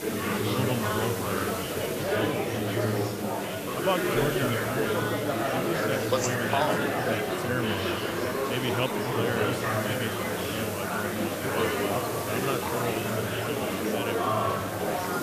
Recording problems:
murmuring crowd; very loud; throughout; 5 dB above the speech
hiss; loud; throughout; 6 dB below the speech

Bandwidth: 14.5 kHz